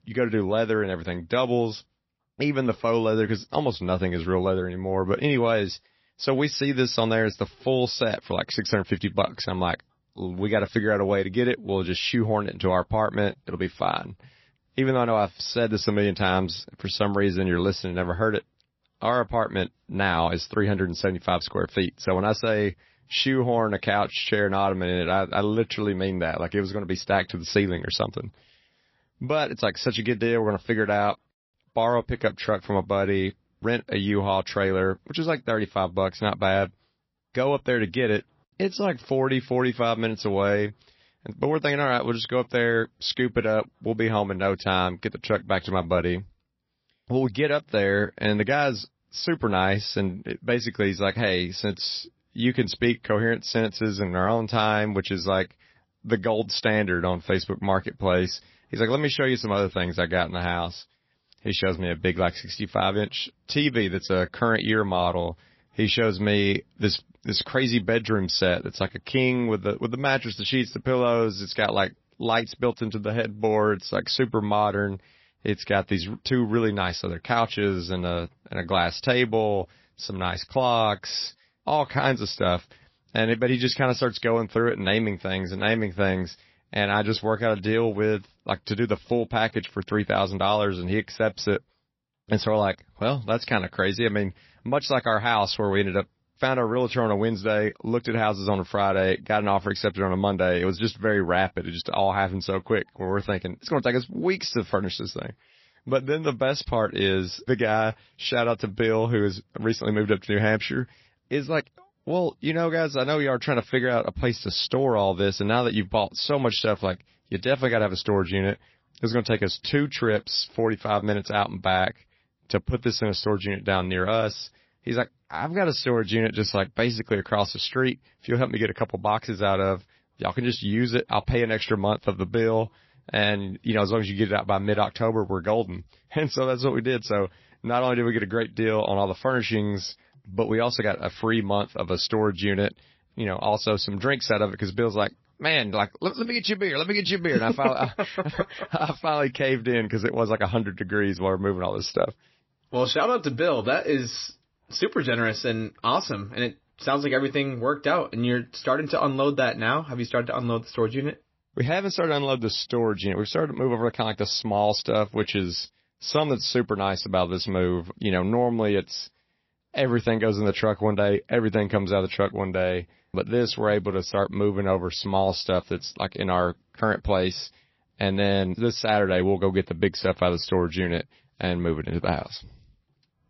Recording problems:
garbled, watery; slightly; nothing above 5.5 kHz

